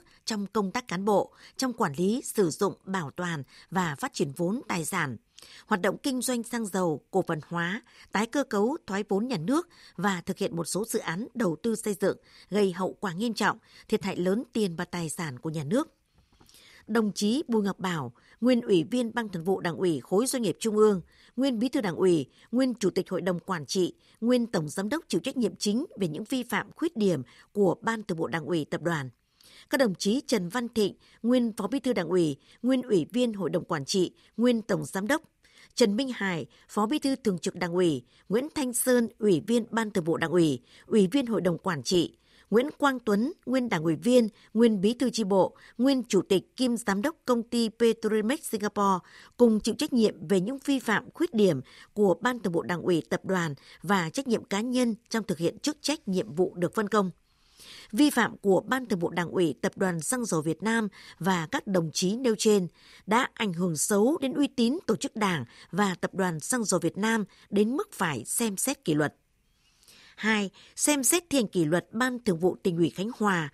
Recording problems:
none

